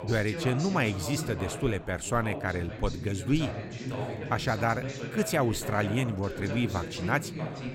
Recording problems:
background chatter; loud; throughout; 2 voices, 7 dB below the speech

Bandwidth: 16 kHz